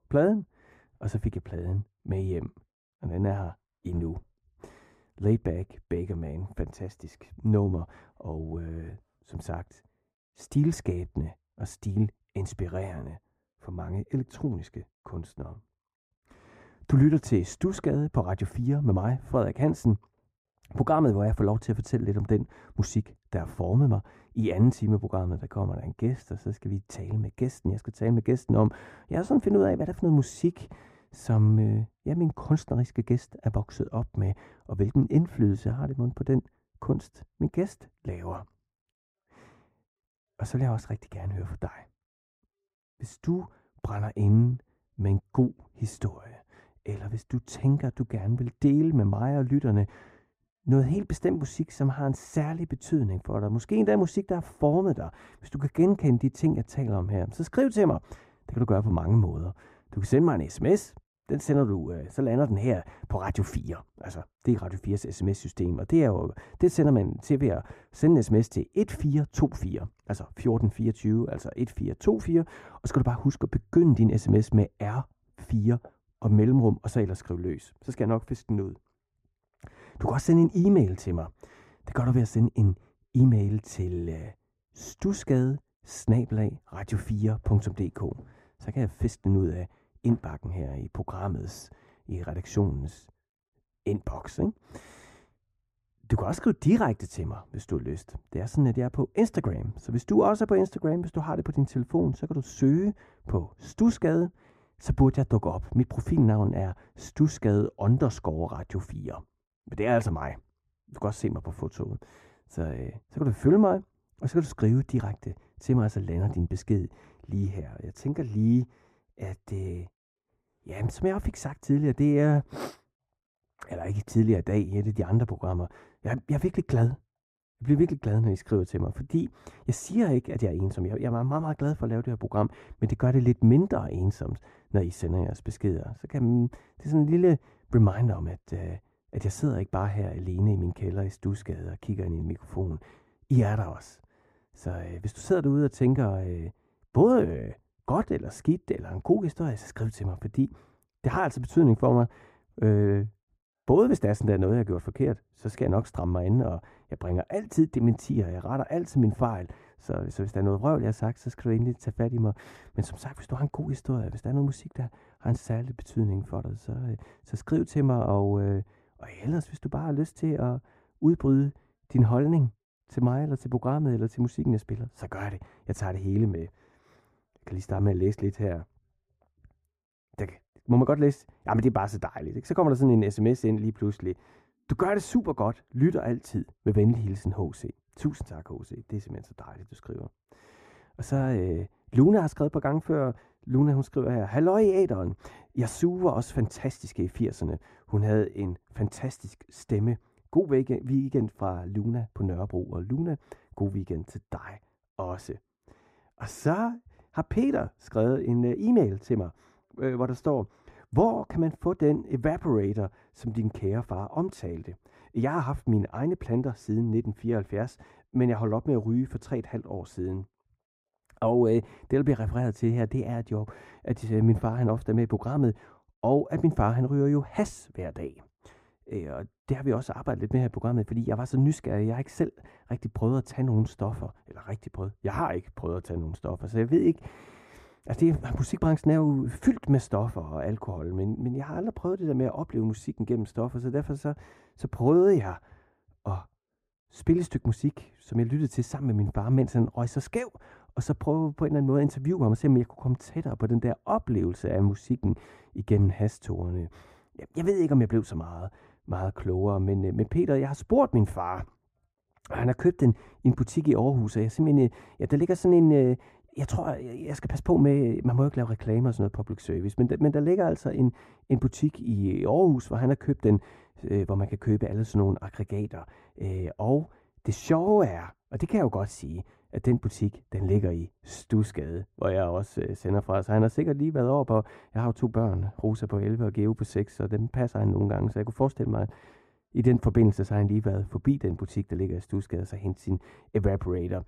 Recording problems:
muffled; very; fading above 2 kHz

